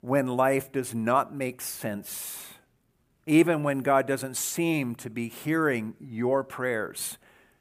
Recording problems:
none

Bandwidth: 15 kHz